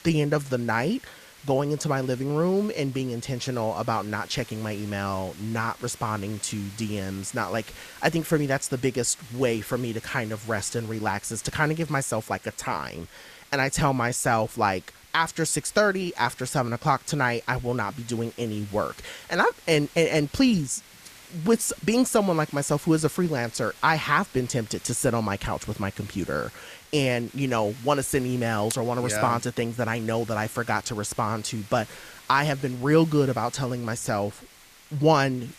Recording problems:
hiss; faint; throughout; 20 dB below the speech

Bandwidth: 14.5 kHz